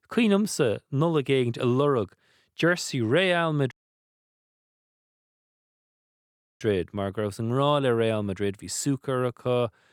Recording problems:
audio cutting out; at 3.5 s for 3 s

